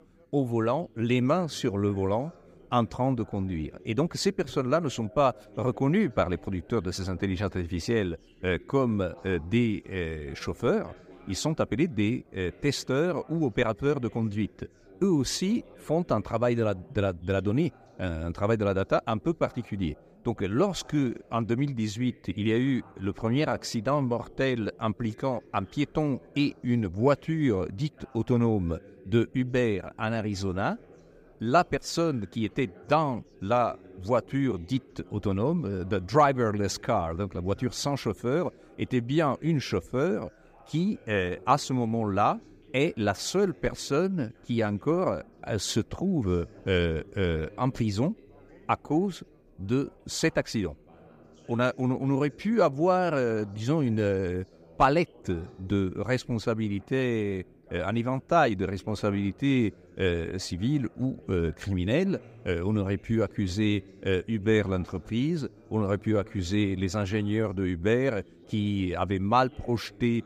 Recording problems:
background chatter; faint; throughout; 3 voices, 25 dB below the speech

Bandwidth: 15.5 kHz